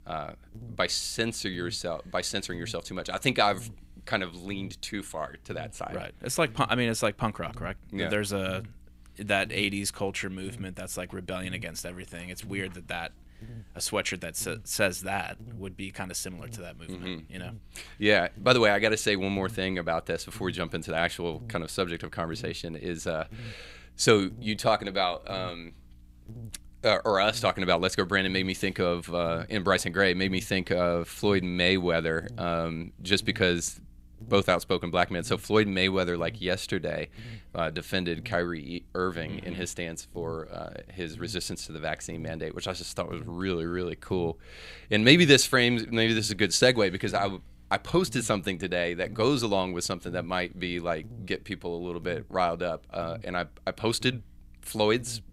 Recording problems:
electrical hum; faint; throughout; 60 Hz, 30 dB below the speech

